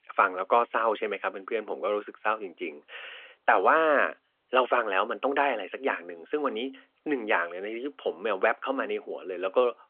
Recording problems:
thin; somewhat; fading below 450 Hz
phone-call audio

